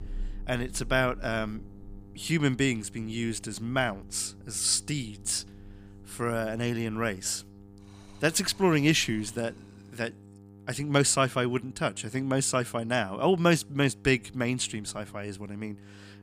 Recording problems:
electrical hum; faint; throughout; 50 Hz, 30 dB below the speech
rain or running water; faint; until 9.5 s; 20 dB below the speech

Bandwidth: 15 kHz